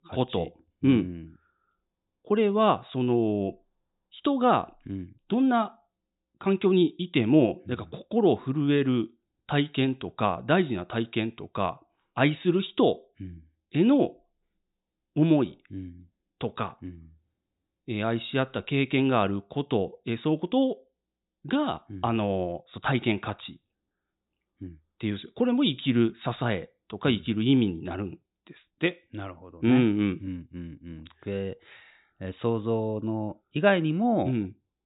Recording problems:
high frequencies cut off; severe; nothing above 4 kHz

